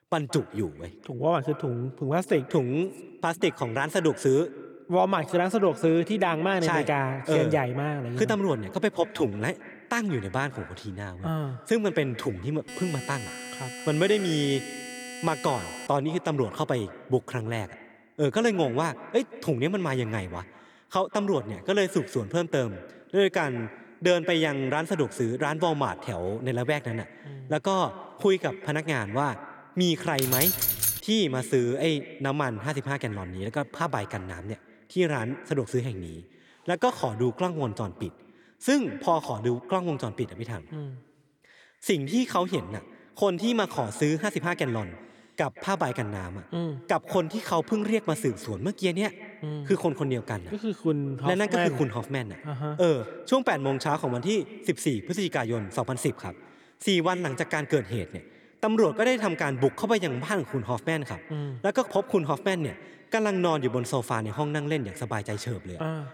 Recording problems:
echo of what is said; noticeable; throughout; 170 ms later, 15 dB below the speech
alarm; noticeable; from 13 to 16 s; peak 10 dB below the speech
jangling keys; loud; at 30 s; peak 6 dB above the speech

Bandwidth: 18.5 kHz